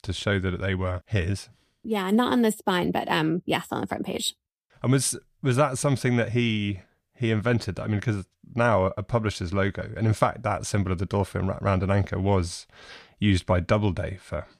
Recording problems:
none

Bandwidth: 15 kHz